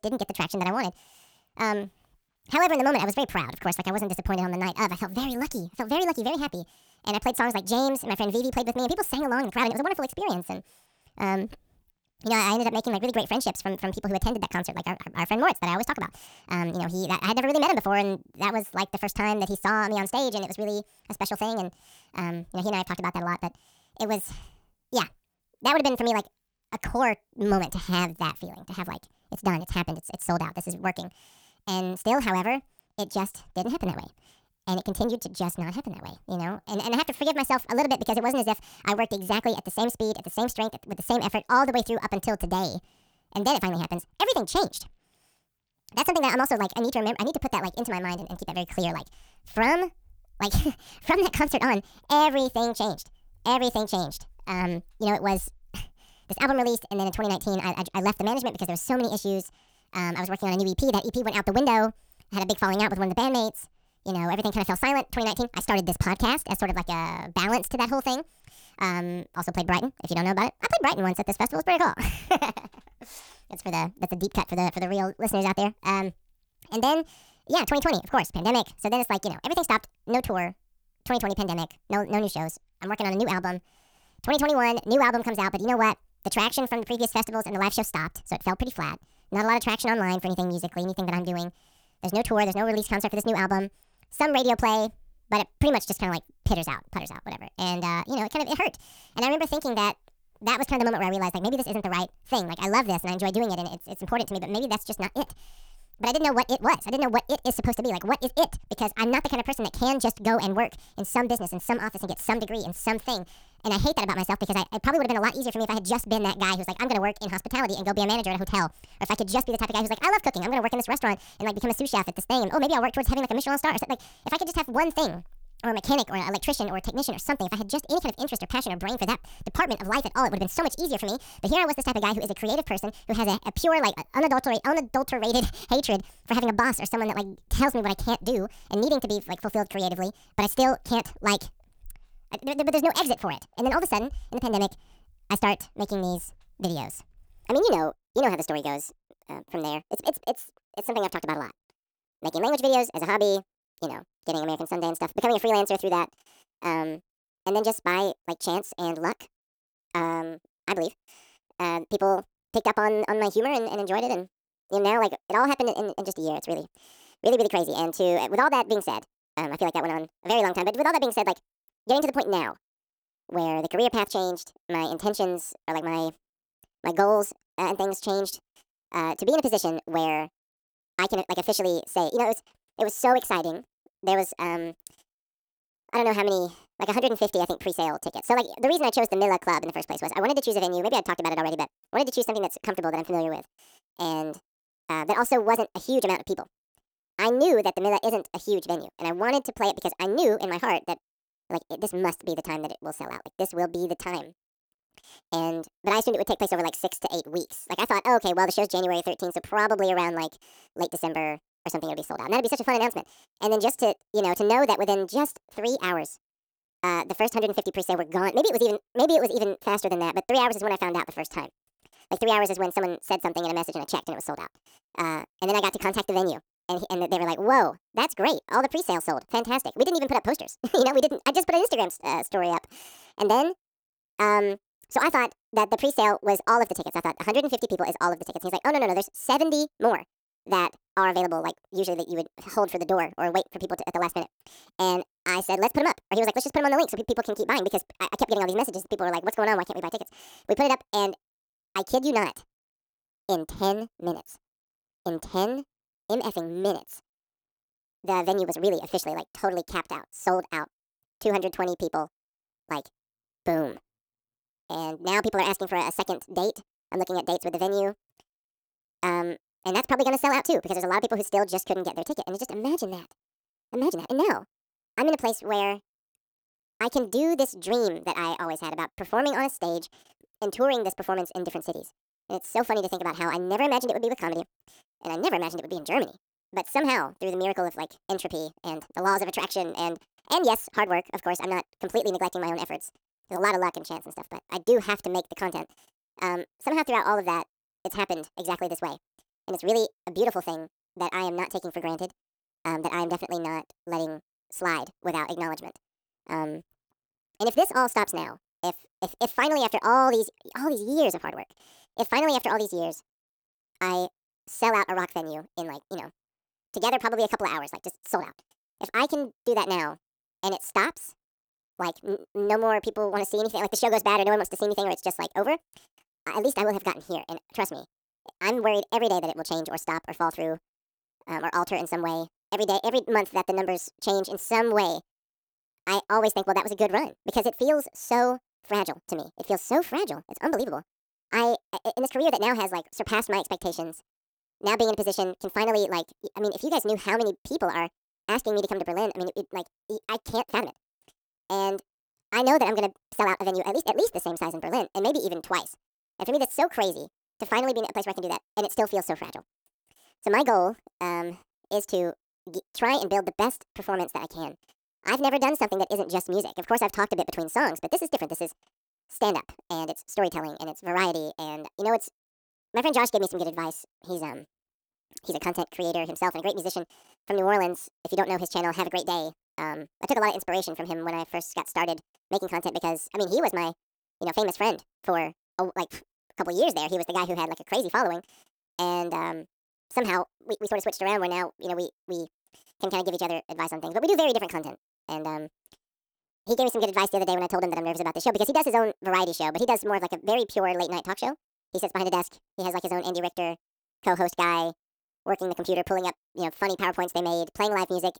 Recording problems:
wrong speed and pitch; too fast and too high; 1.6 times normal speed
uneven, jittery; strongly; from 9.5 s to 6:31

